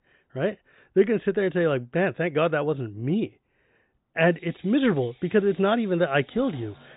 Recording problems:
high frequencies cut off; severe; nothing above 4 kHz
machinery noise; faint; from 4.5 s on; 30 dB below the speech

